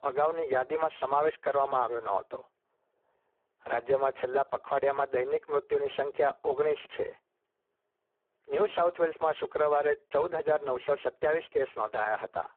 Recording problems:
phone-call audio; poor line

